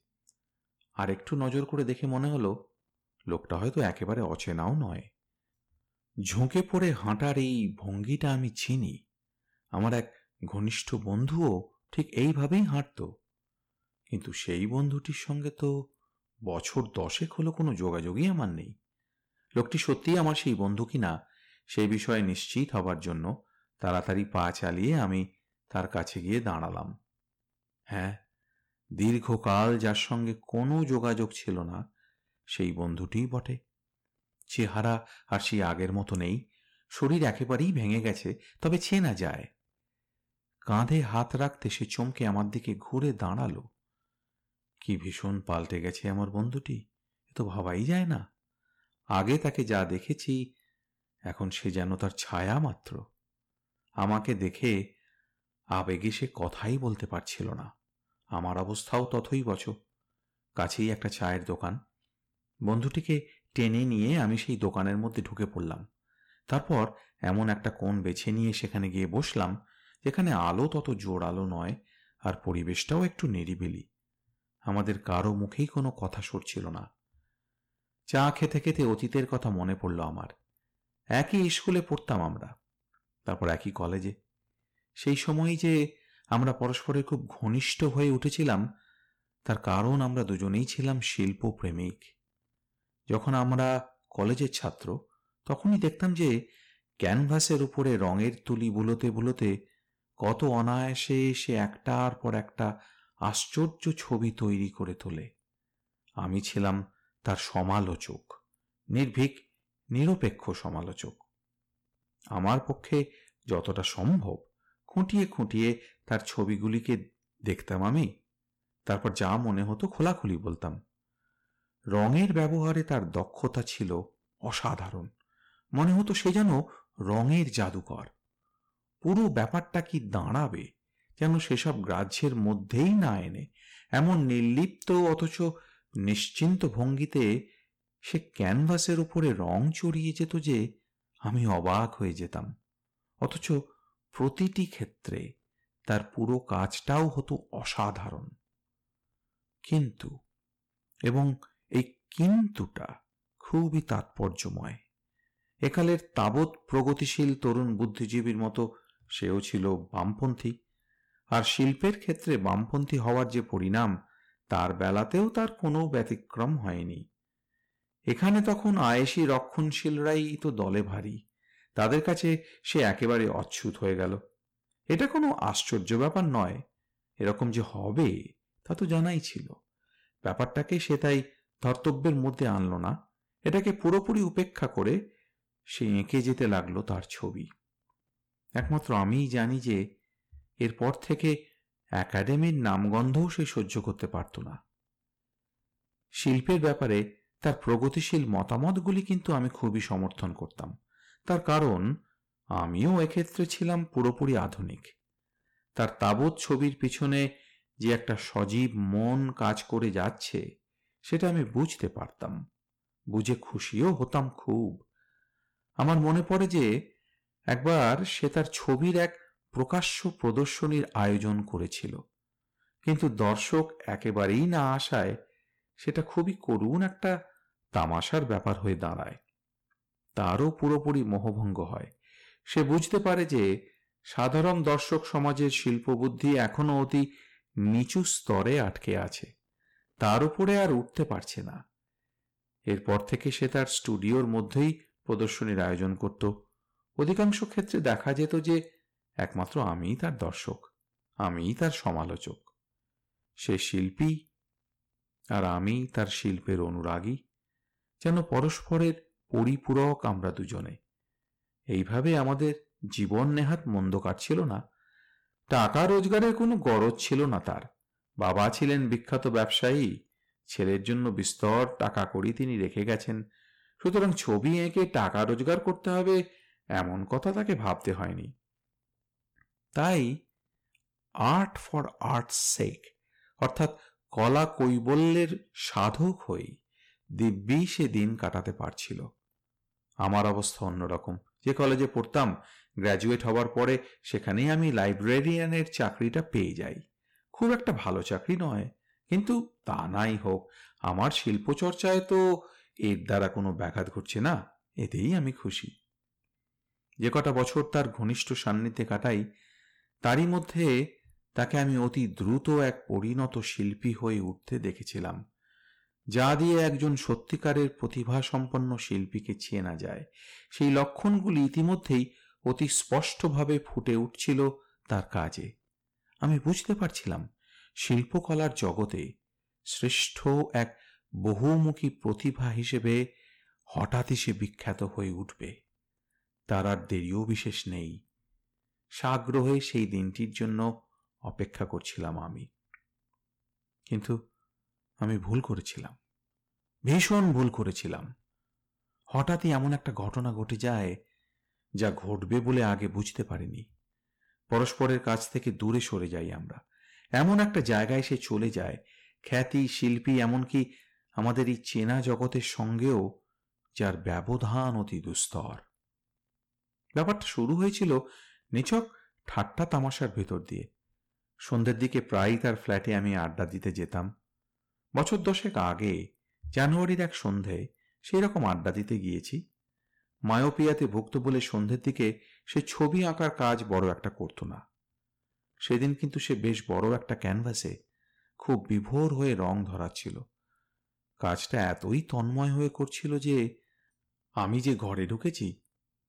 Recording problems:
distortion; slight; 3% of the sound clipped

